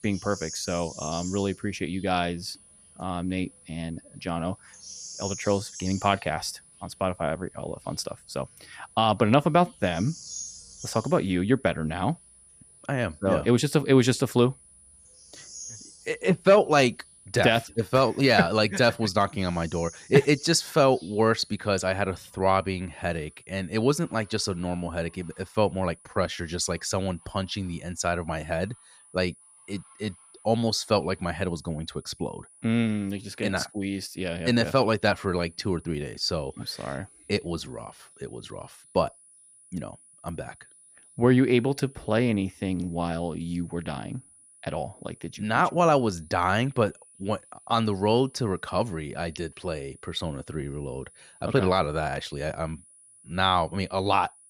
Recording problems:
animal sounds; noticeable; throughout; 15 dB below the speech
high-pitched whine; faint; throughout; 10 kHz, 25 dB below the speech

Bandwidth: 14.5 kHz